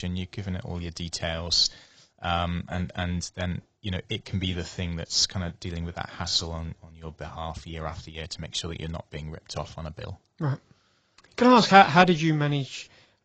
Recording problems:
garbled, watery; badly; nothing above 7.5 kHz
abrupt cut into speech; at the start

